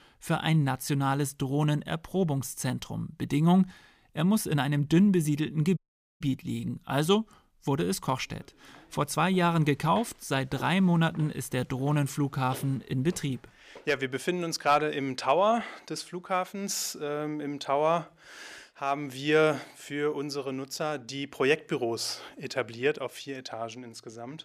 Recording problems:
audio cutting out; at 6 s

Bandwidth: 15 kHz